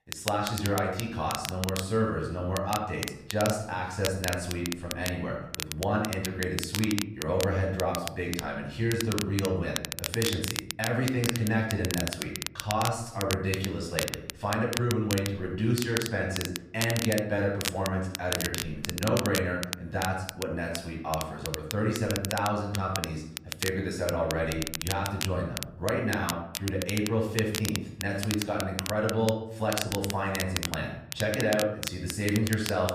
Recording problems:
off-mic speech; far
room echo; noticeable; dies away in 0.7 s
crackle, like an old record; loud; 5 dB below the speech

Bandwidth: 14.5 kHz